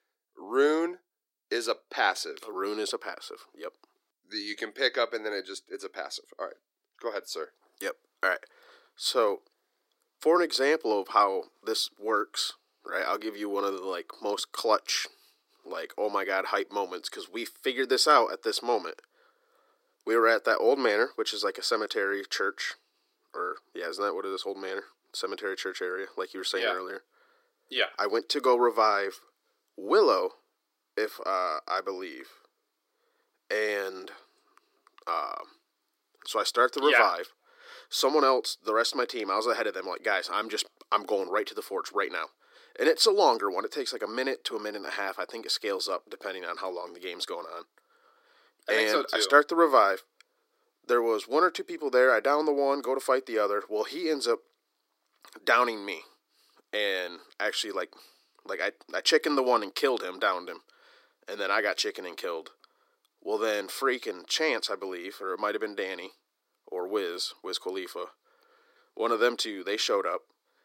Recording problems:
thin; somewhat; fading below 300 Hz

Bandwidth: 16 kHz